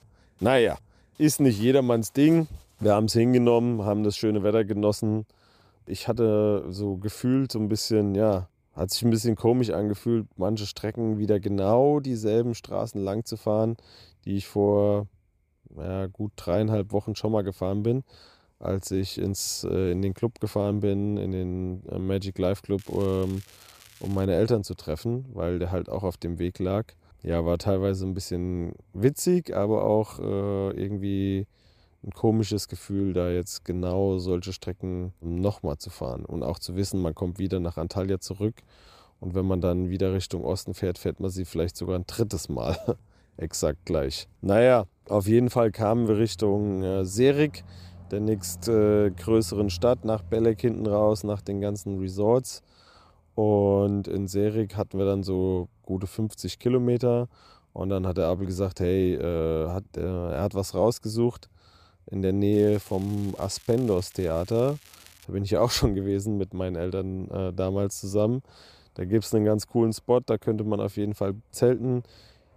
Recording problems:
crackling; faint; from 23 to 24 s and from 1:03 to 1:05; 25 dB below the speech

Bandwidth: 14.5 kHz